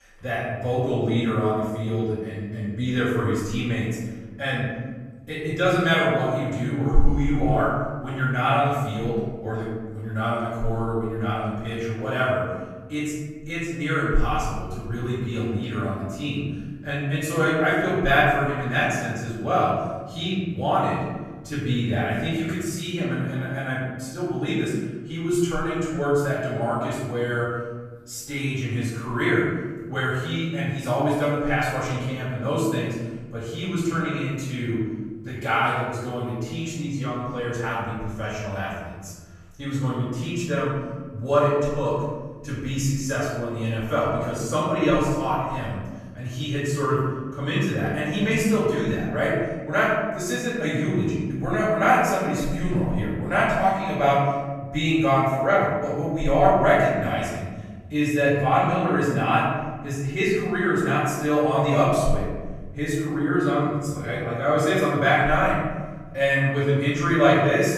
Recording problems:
room echo; strong; dies away in 1.5 s
off-mic speech; far

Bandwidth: 14 kHz